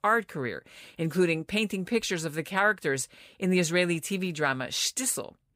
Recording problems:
none

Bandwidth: 15.5 kHz